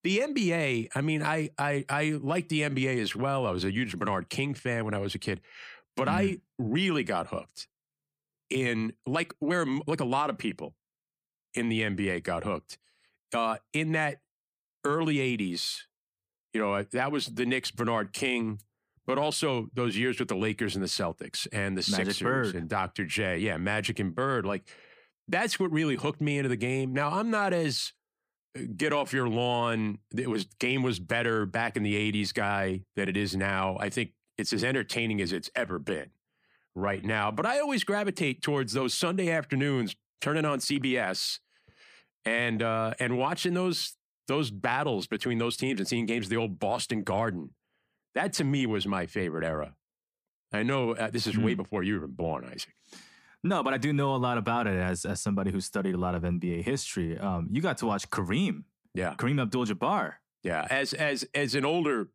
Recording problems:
uneven, jittery; strongly; from 3 s to 1:00

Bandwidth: 15 kHz